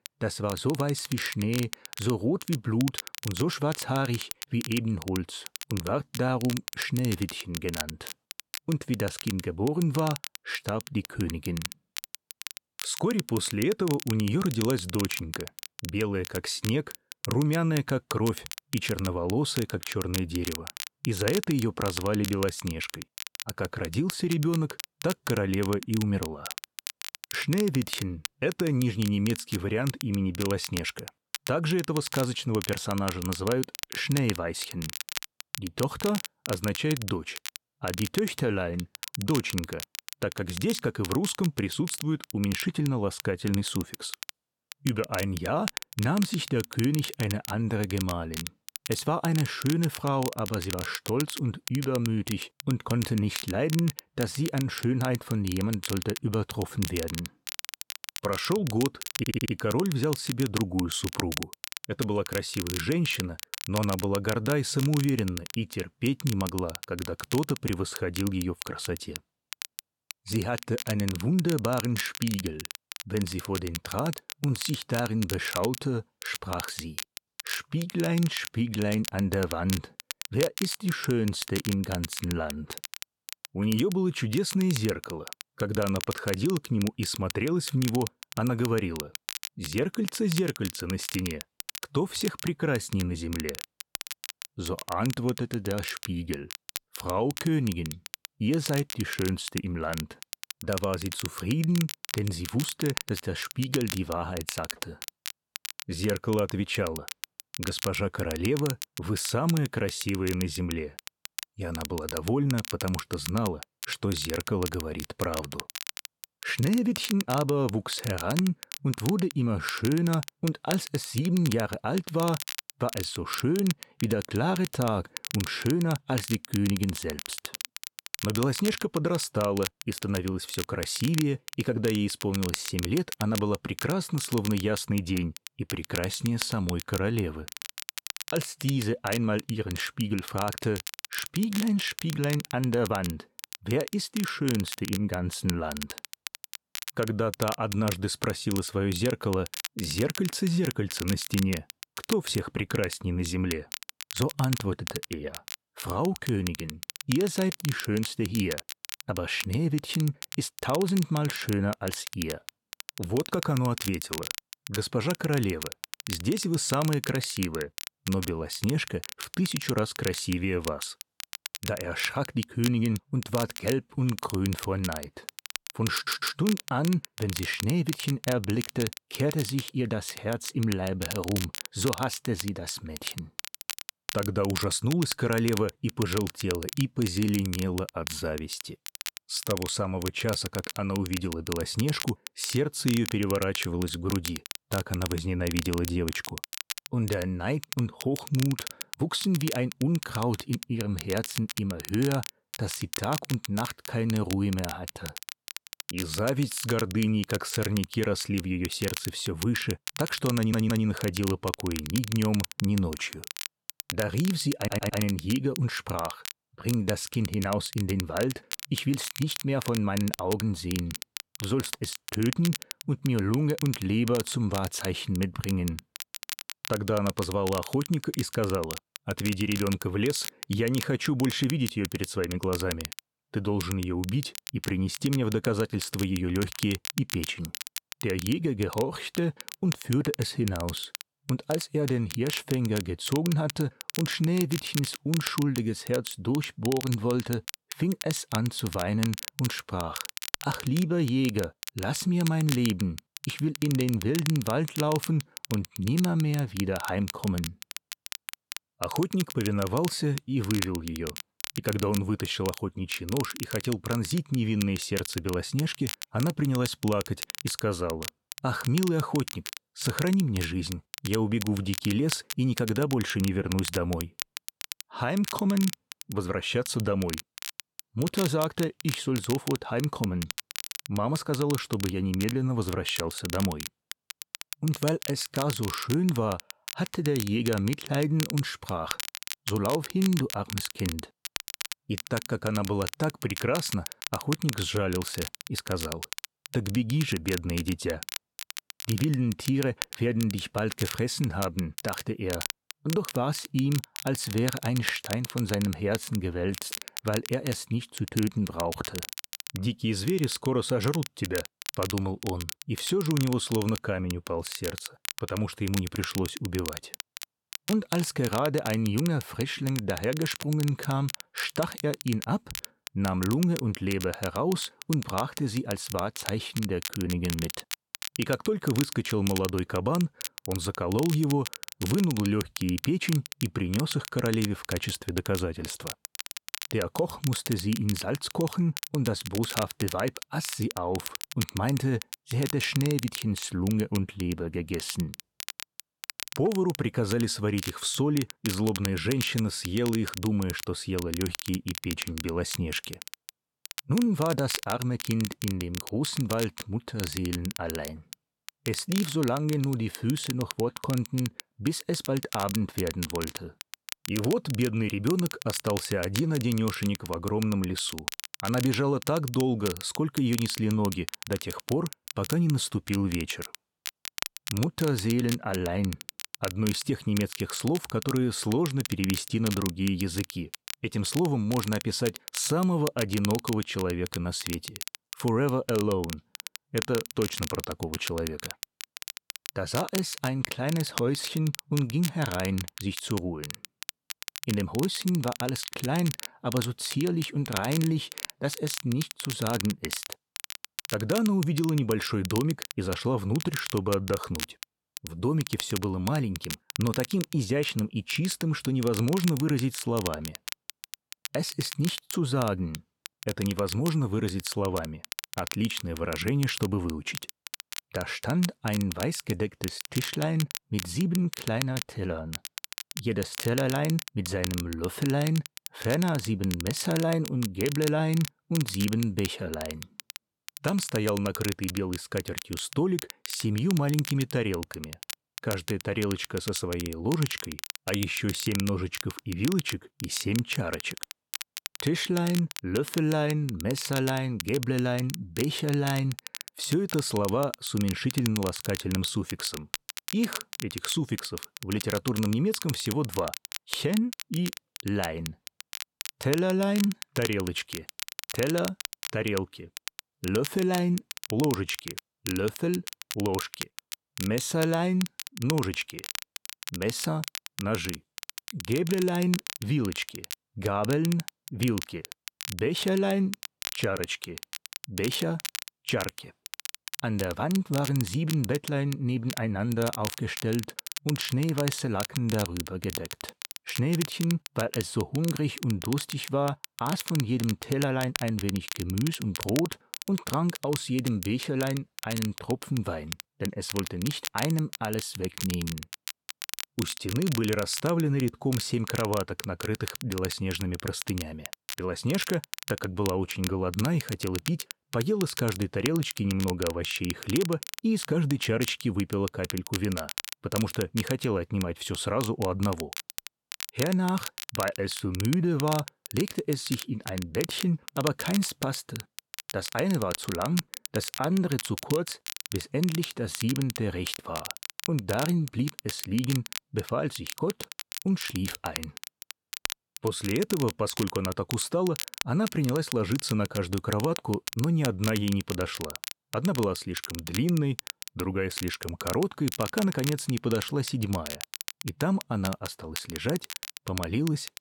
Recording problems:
crackle, like an old record; loud; 9 dB below the speech
audio stuttering; 4 times, first at 59 s

